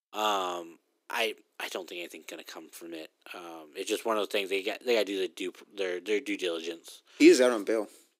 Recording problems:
thin; very; fading below 300 Hz

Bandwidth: 15.5 kHz